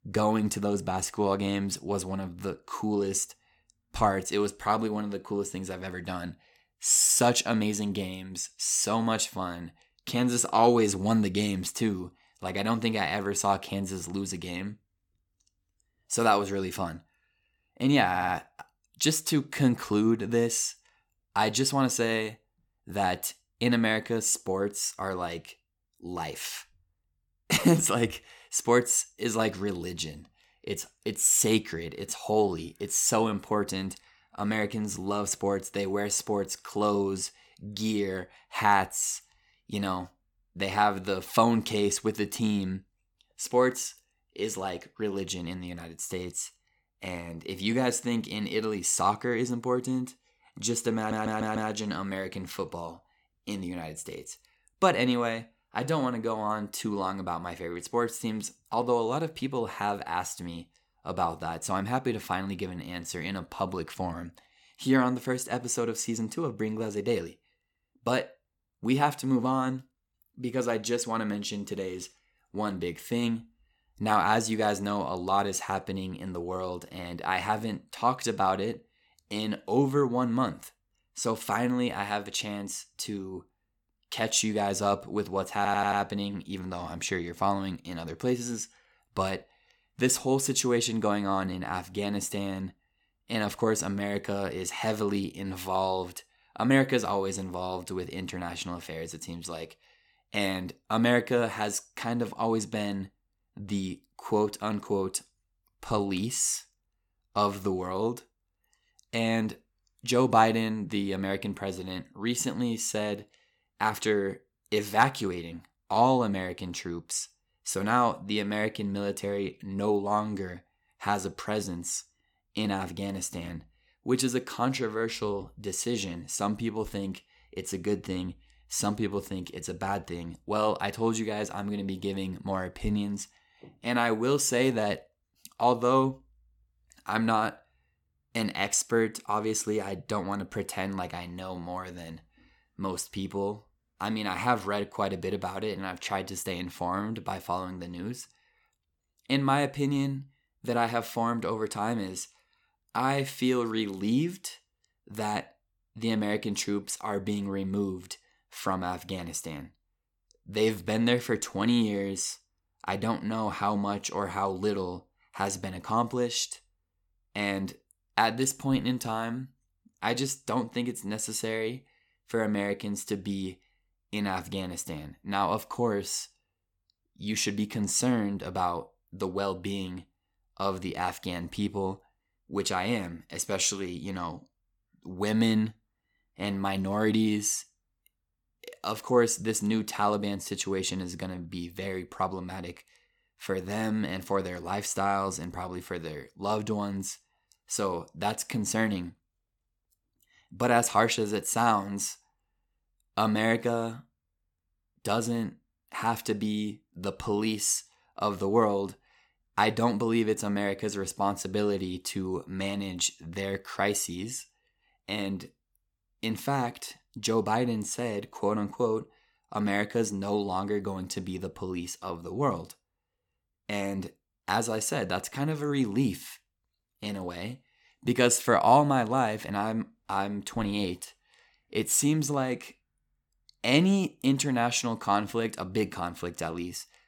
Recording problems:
audio stuttering; at 18 s, at 51 s and at 1:26

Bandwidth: 17.5 kHz